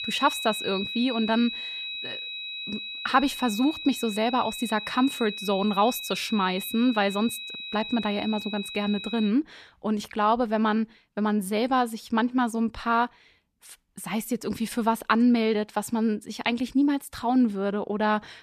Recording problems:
high-pitched whine; loud; until 9.5 s; 4 kHz, 7 dB below the speech

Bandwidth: 14.5 kHz